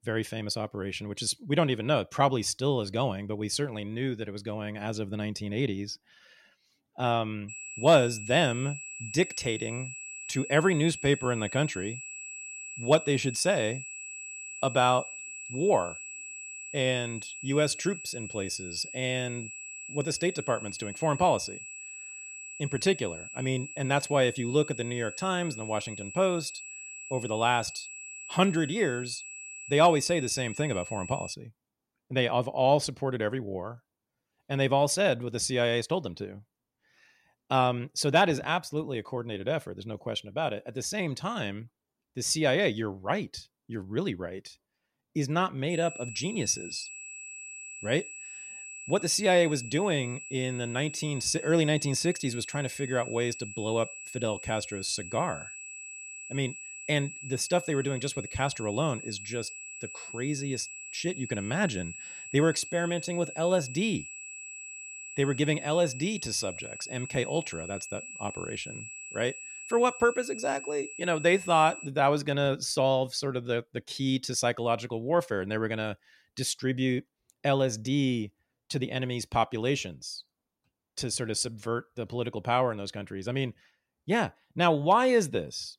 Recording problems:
high-pitched whine; noticeable; from 7.5 to 31 s and from 46 s to 1:12; 2.5 kHz, 10 dB below the speech

